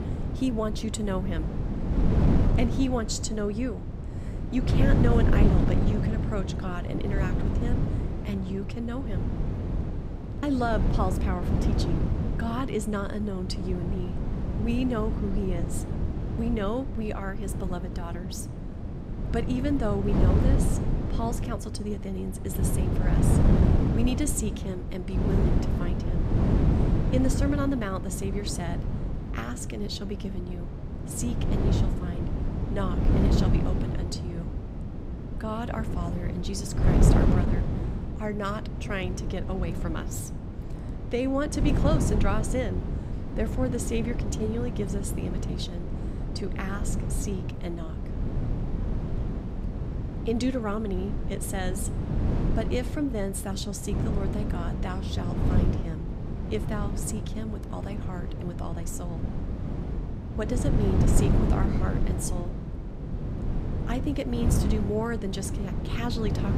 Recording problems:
wind noise on the microphone; heavy; 3 dB below the speech

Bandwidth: 15.5 kHz